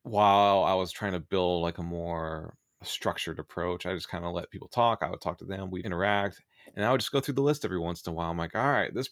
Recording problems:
none

